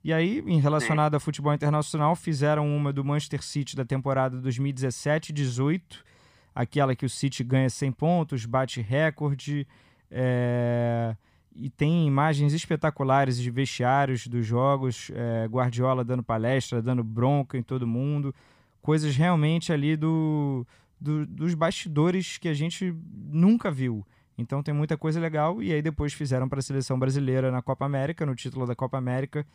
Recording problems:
none

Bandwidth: 15 kHz